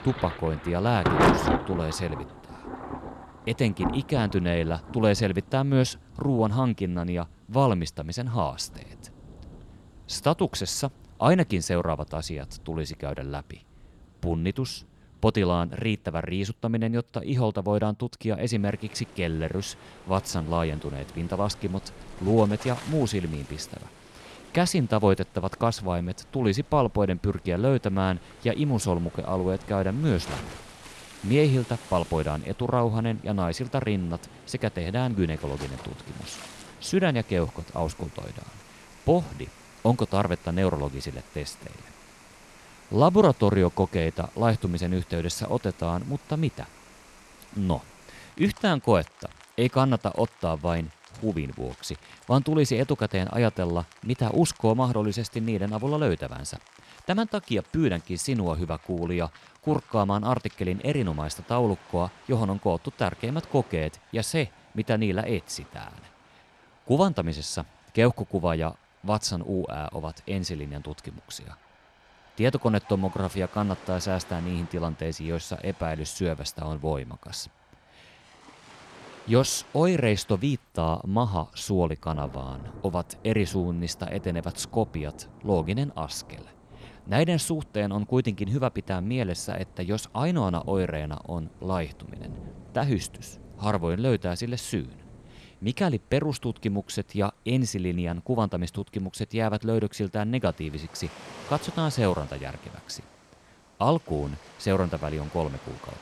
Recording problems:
rain or running water; noticeable; throughout; 15 dB below the speech

